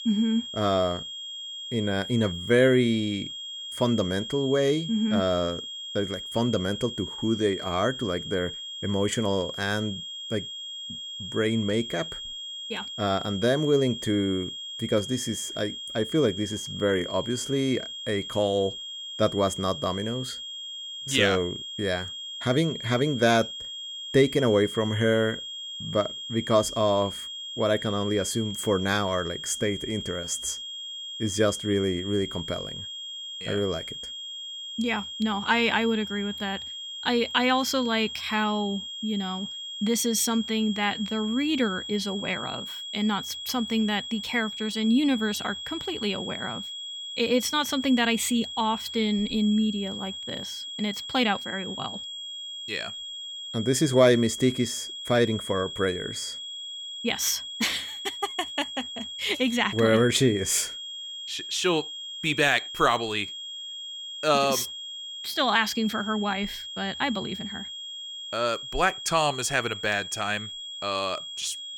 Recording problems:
high-pitched whine; loud; throughout; 3.5 kHz, 8 dB below the speech

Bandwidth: 17.5 kHz